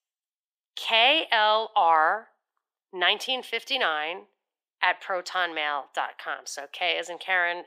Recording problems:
thin; very; fading below 450 Hz

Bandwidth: 15.5 kHz